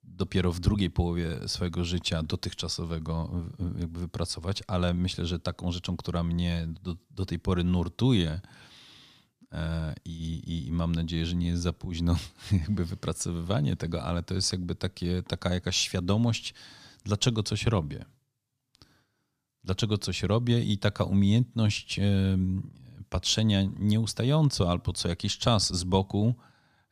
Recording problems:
none

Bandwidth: 14.5 kHz